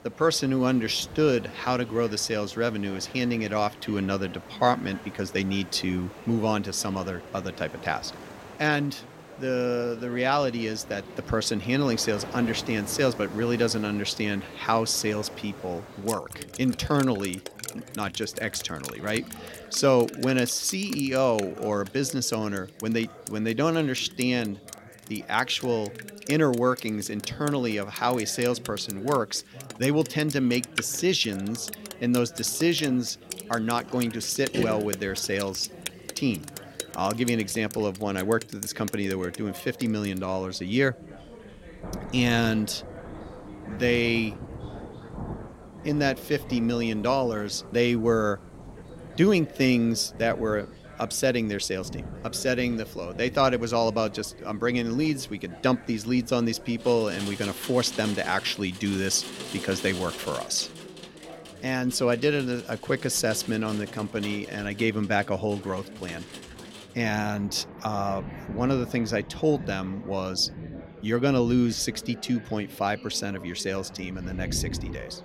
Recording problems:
rain or running water; noticeable; throughout; 15 dB below the speech
chatter from many people; noticeable; throughout; 20 dB below the speech

